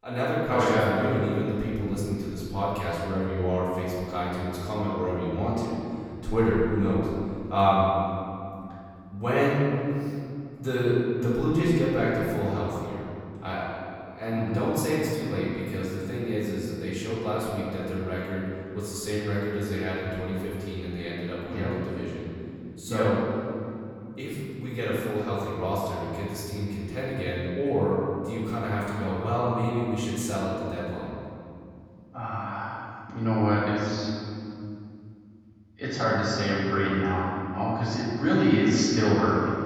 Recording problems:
room echo; strong; dies away in 2.6 s
off-mic speech; far

